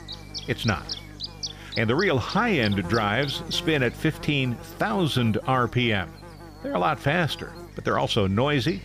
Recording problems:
electrical hum; noticeable; throughout; 50 Hz, 15 dB below the speech

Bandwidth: 15 kHz